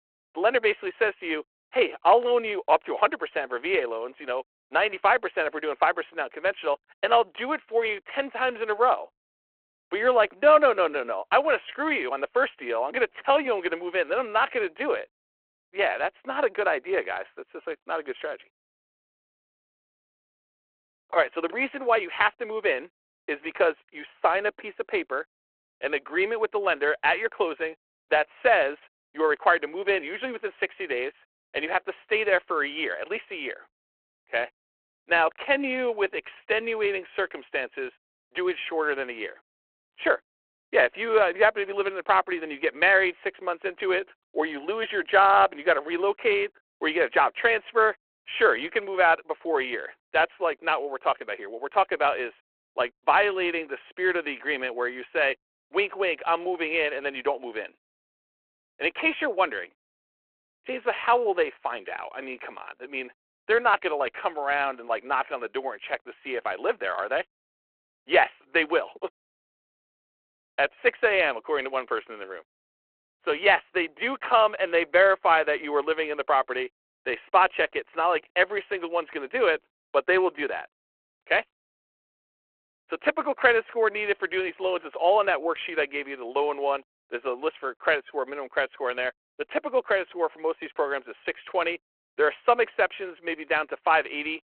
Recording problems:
phone-call audio

